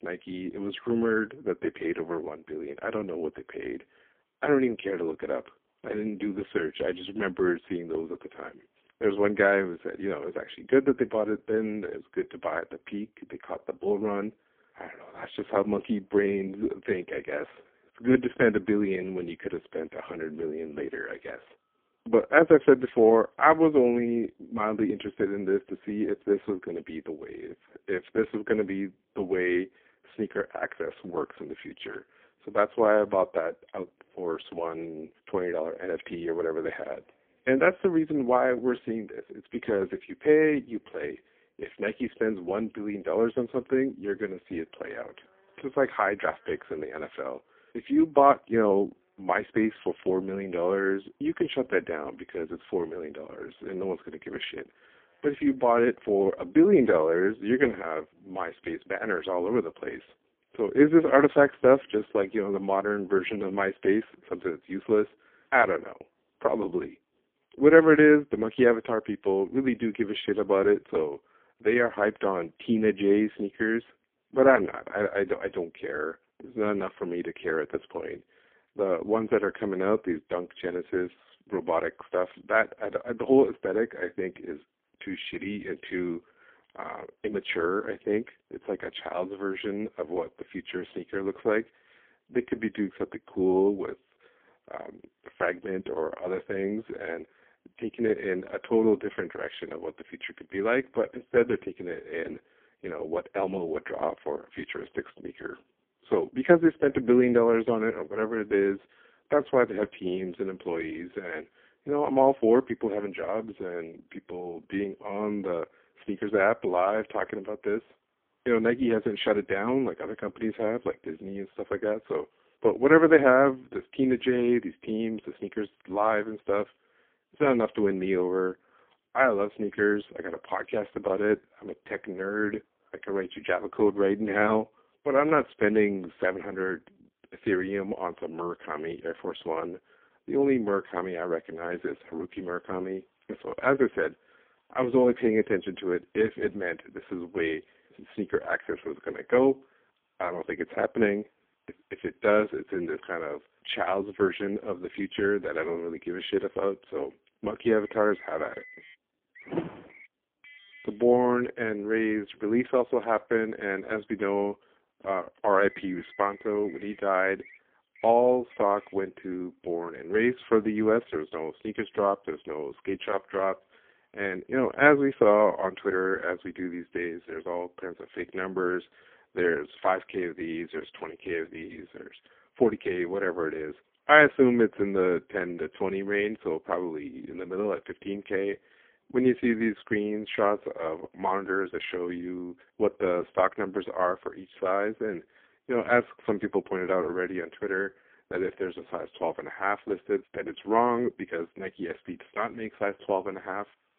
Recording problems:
phone-call audio; poor line; nothing above 3.5 kHz
traffic noise; faint; throughout; 30 dB below the speech

